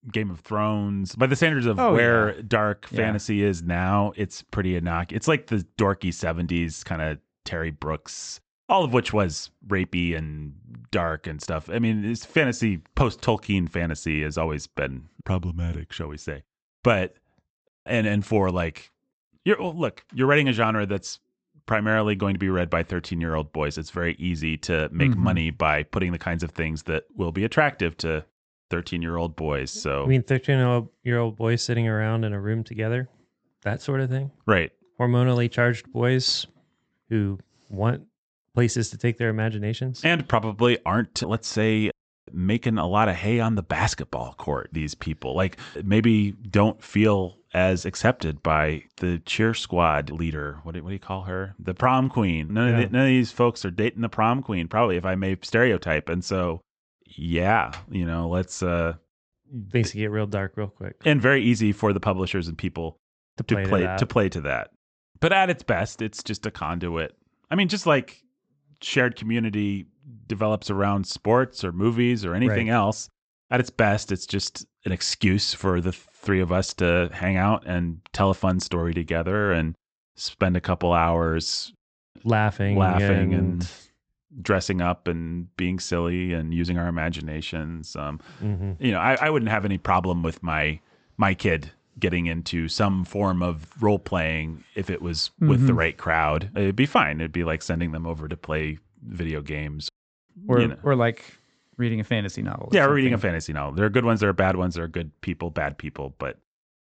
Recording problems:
high frequencies cut off; noticeable; nothing above 8 kHz

